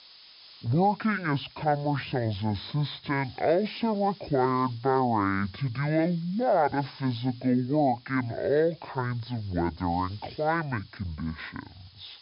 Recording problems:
wrong speed and pitch; too slow and too low; 0.6 times normal speed
high frequencies cut off; noticeable; nothing above 5.5 kHz
hiss; faint; throughout; 25 dB below the speech

